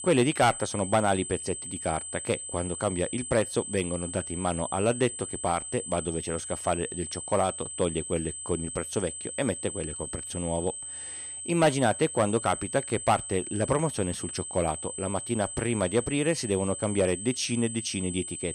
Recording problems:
high-pitched whine; loud; throughout; 8 kHz, 6 dB below the speech

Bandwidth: 15 kHz